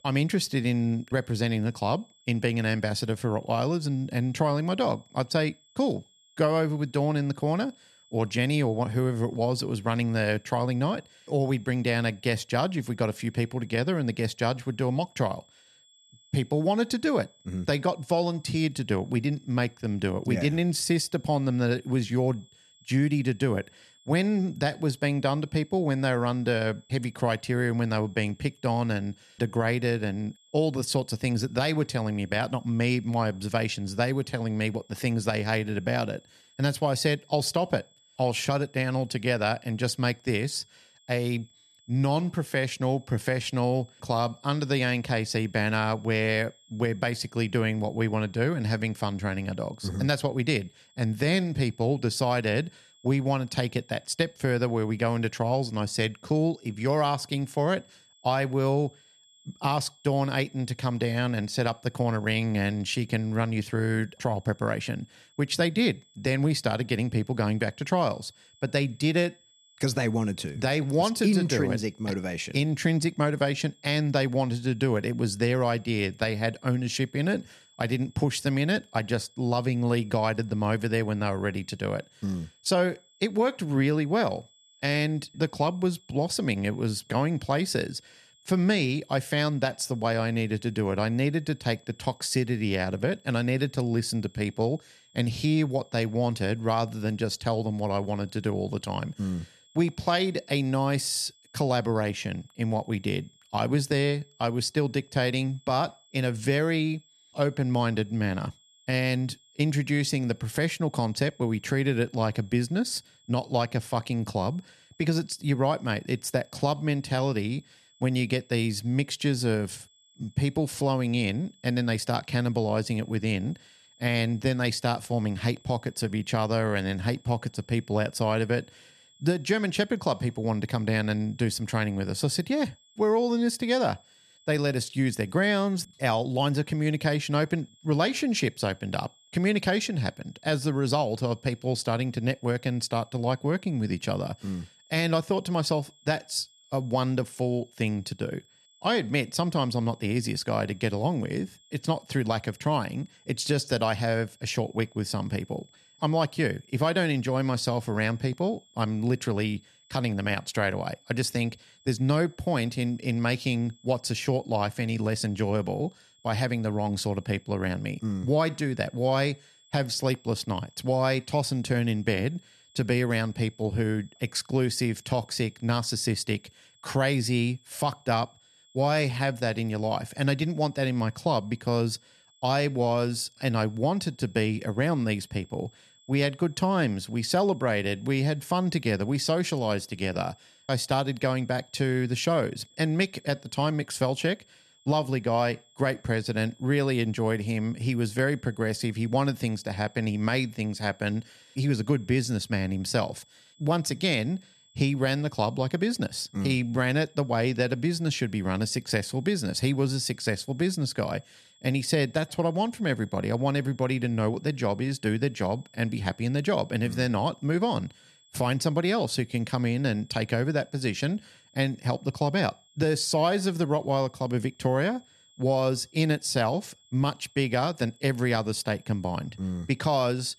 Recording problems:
high-pitched whine; faint; throughout; 3.5 kHz, 30 dB below the speech

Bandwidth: 13.5 kHz